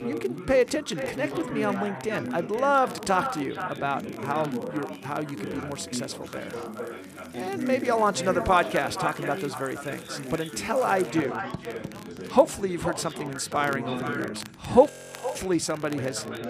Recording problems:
echo of what is said; strong; throughout; 470 ms later, 10 dB below the speech
background chatter; loud; throughout; 4 voices, 9 dB below the speech
household noises; faint; throughout; 20 dB below the speech
crackle, like an old record; faint; 25 dB below the speech
audio freezing; at 15 s

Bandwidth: 14.5 kHz